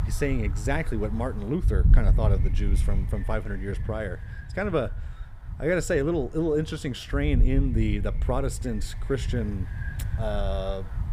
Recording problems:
wind noise on the microphone; occasional gusts; 15 dB below the speech

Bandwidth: 15.5 kHz